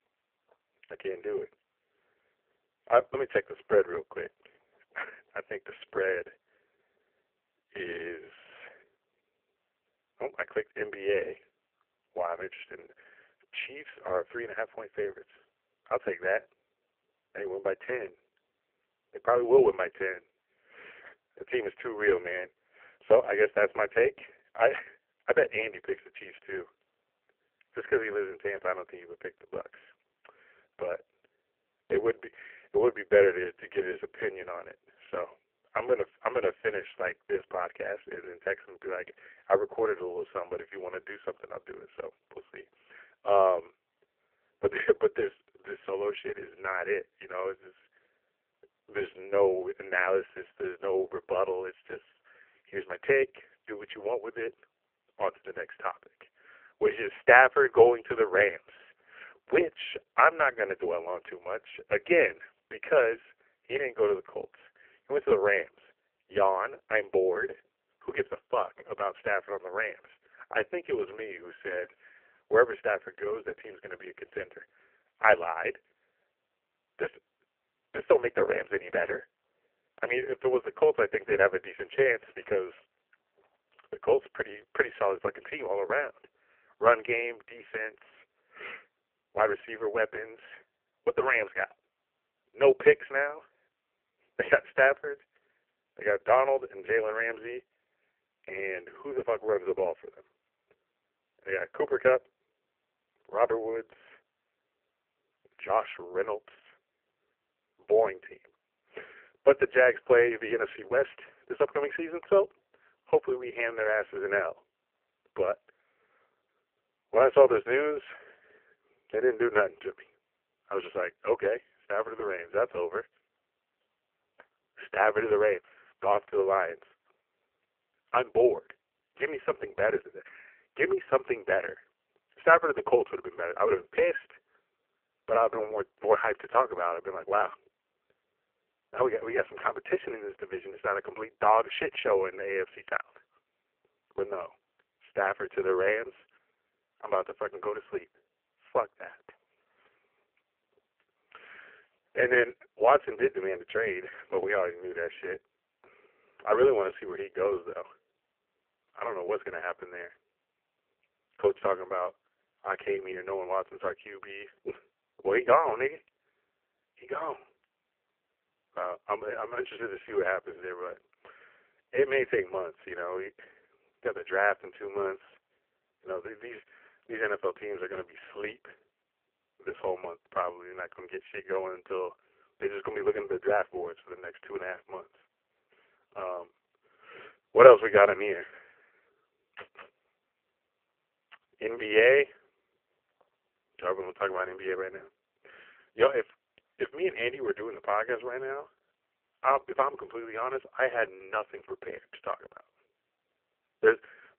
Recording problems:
phone-call audio; poor line

